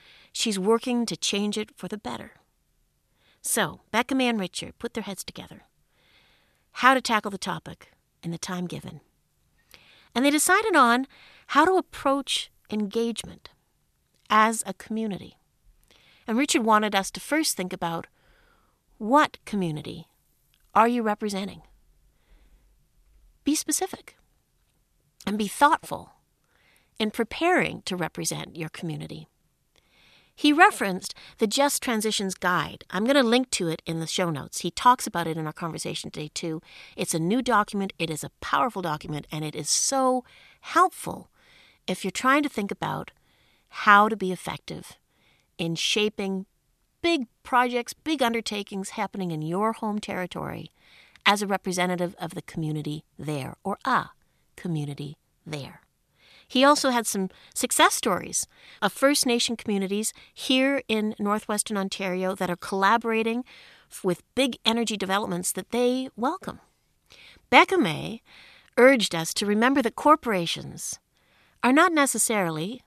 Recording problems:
none

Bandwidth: 14 kHz